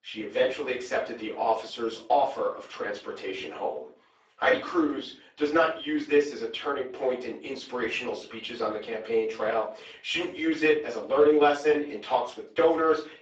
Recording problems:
off-mic speech; far
garbled, watery; badly; nothing above 7.5 kHz
room echo; slight; dies away in 0.3 s
thin; very slightly; fading below 350 Hz

